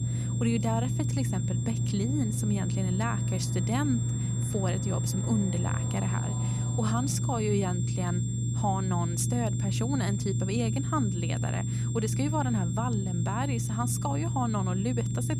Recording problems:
high-pitched whine; loud; throughout; 7.5 kHz, 9 dB below the speech
low rumble; loud; throughout; 7 dB below the speech
train or aircraft noise; noticeable; until 7 s; 15 dB below the speech

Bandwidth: 14.5 kHz